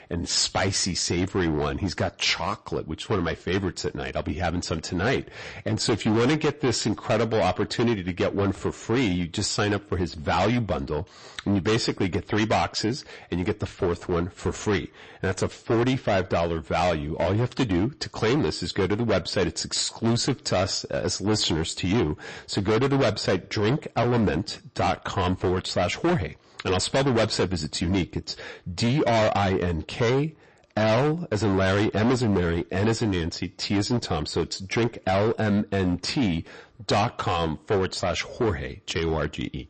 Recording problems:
distortion; heavy; 14% of the sound clipped
garbled, watery; slightly; nothing above 8 kHz

